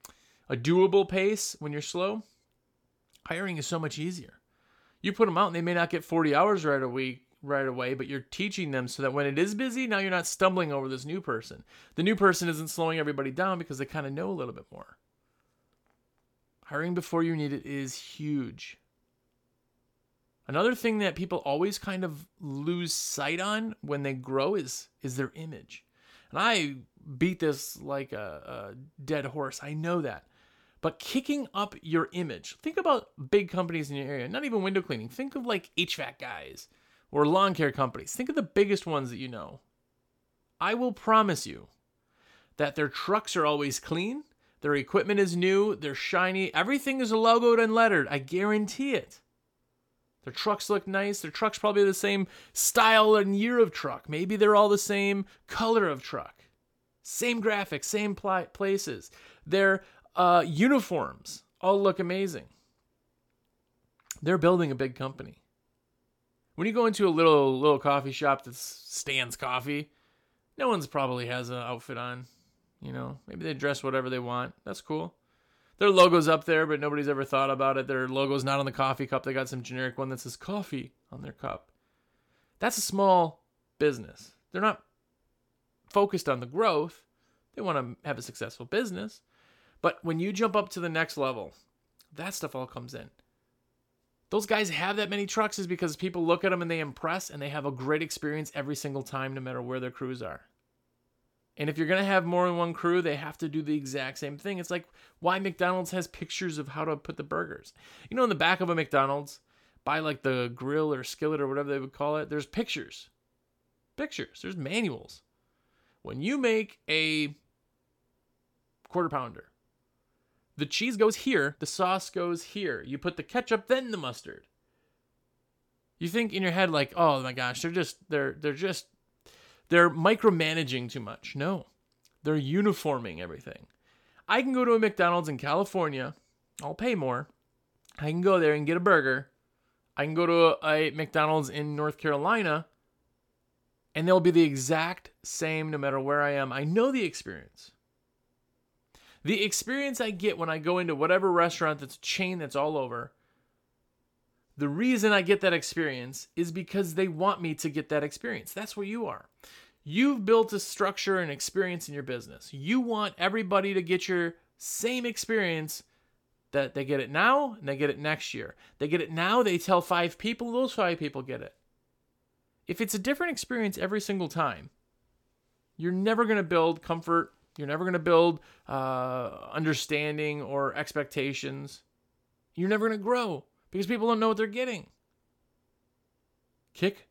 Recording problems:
uneven, jittery; strongly; from 6.5 s to 2:41

